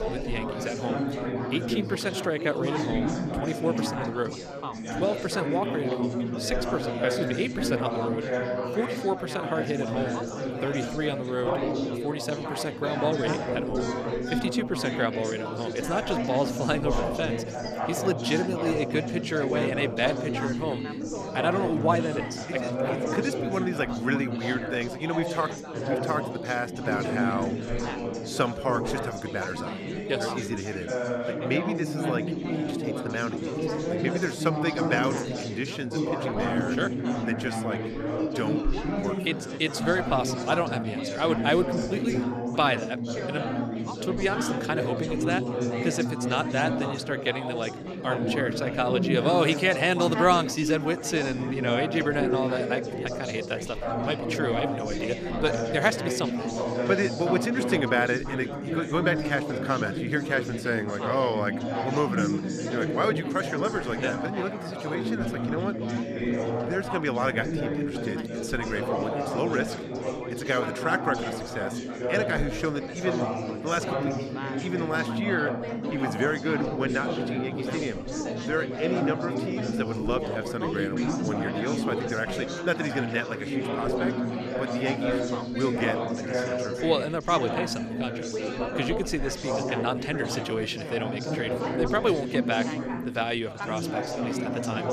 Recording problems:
chatter from many people; loud; throughout; 1 dB below the speech

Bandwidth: 14 kHz